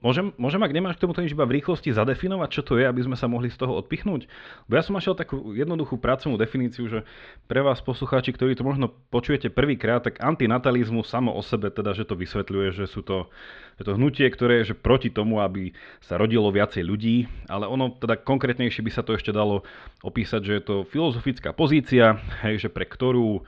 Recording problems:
muffled; slightly; fading above 4 kHz

